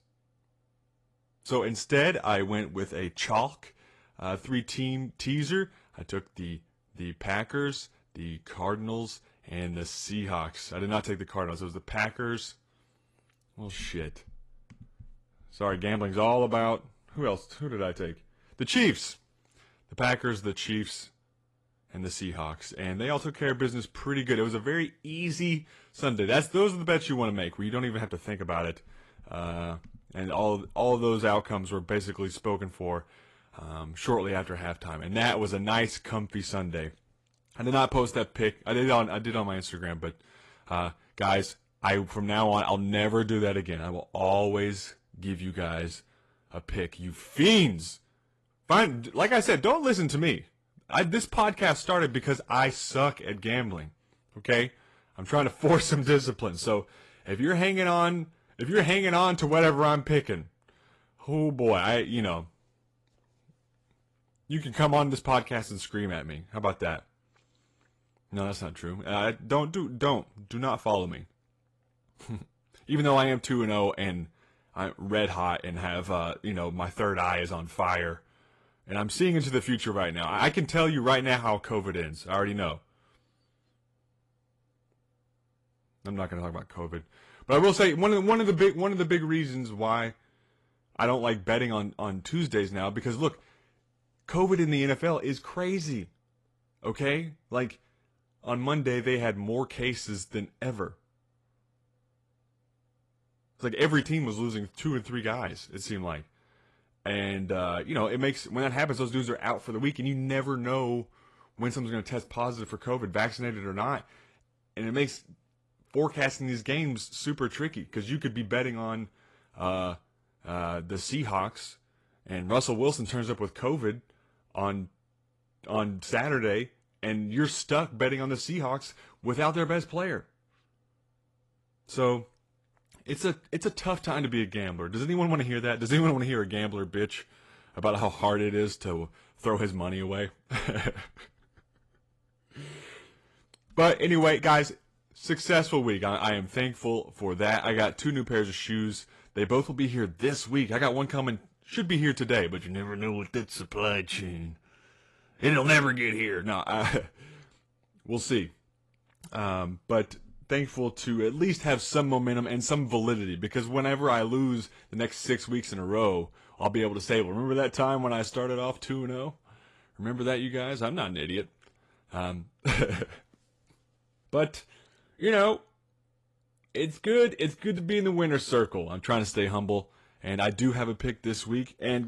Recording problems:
garbled, watery; slightly; nothing above 11 kHz
abrupt cut into speech; at the end

